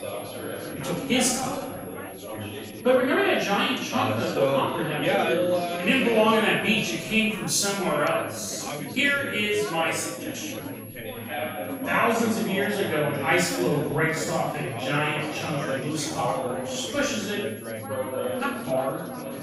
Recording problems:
off-mic speech; far
room echo; noticeable; dies away in 0.7 s
chatter from many people; loud; throughout; 6 dB below the speech
high-pitched whine; noticeable; throughout; 11.5 kHz, 20 dB below the speech
uneven, jittery; strongly; from 0.5 to 19 s

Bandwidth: 15.5 kHz